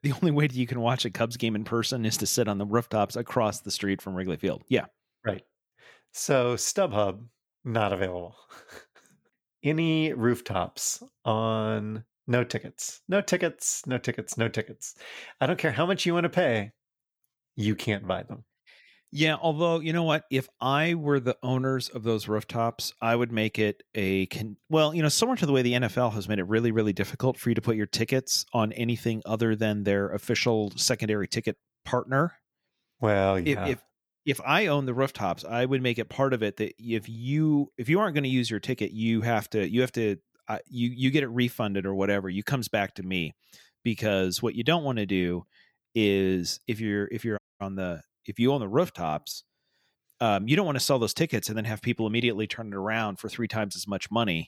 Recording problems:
audio cutting out; at 47 s

